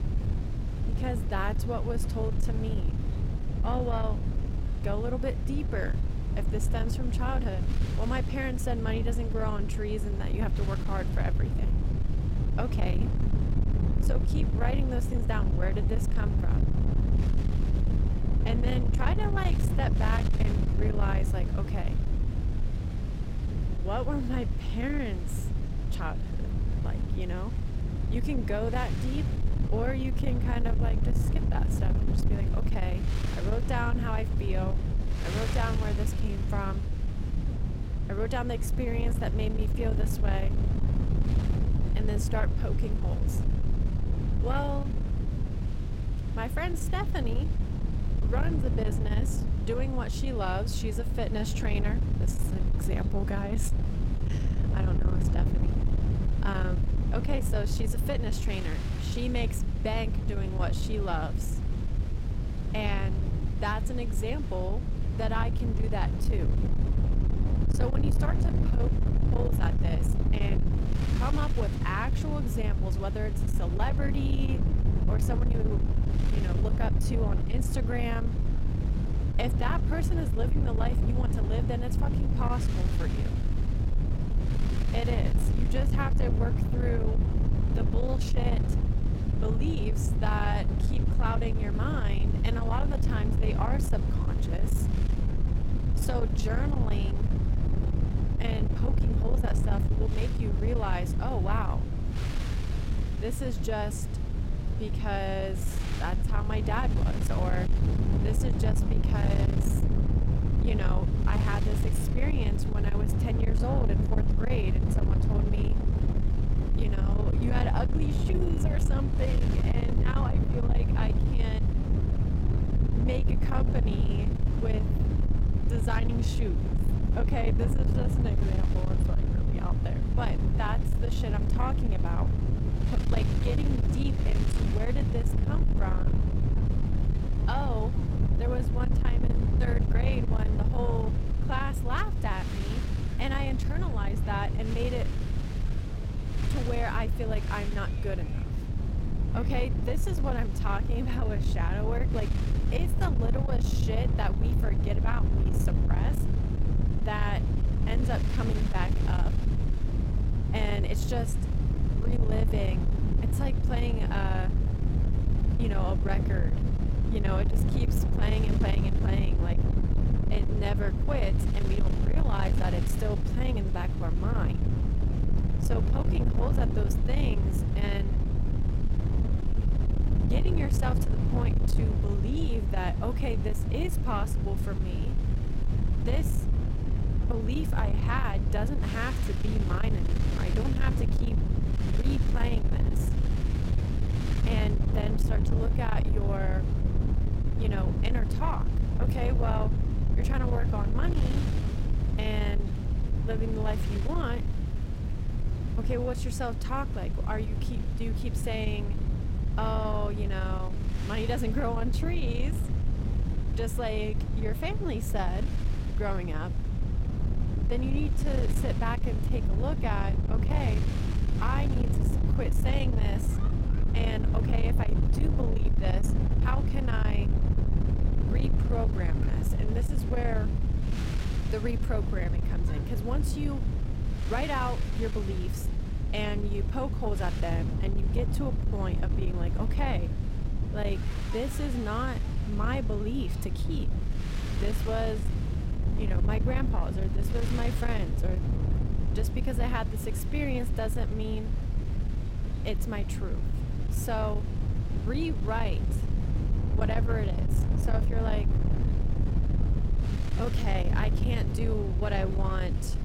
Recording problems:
distortion; slight; 10 dB below the speech
low rumble; loud; throughout; 5 dB below the speech
wind noise on the microphone; occasional gusts; 15 dB below the speech
murmuring crowd; faint; throughout; 20 dB below the speech

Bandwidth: 16 kHz